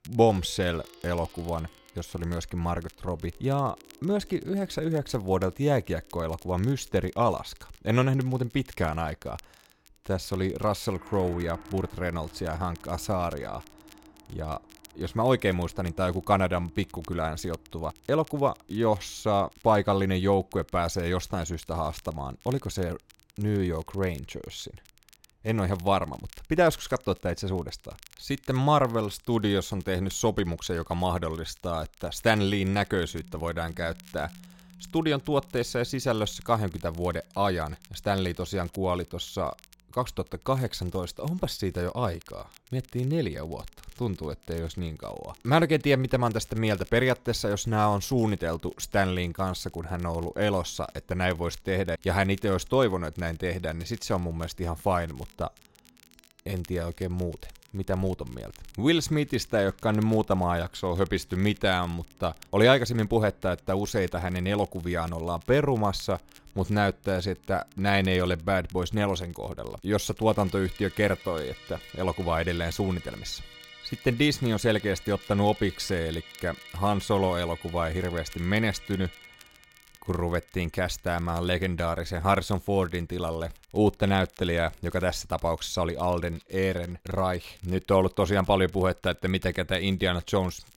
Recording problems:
background music; faint; throughout; 25 dB below the speech
crackle, like an old record; faint; 25 dB below the speech

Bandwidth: 16 kHz